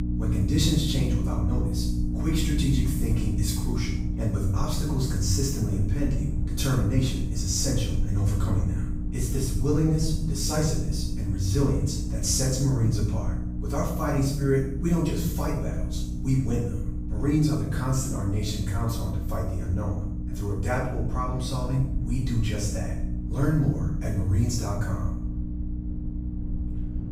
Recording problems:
off-mic speech; far
room echo; noticeable; dies away in 0.7 s
electrical hum; loud; throughout; 60 Hz, 9 dB below the speech
low rumble; noticeable; throughout; 20 dB below the speech

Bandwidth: 15.5 kHz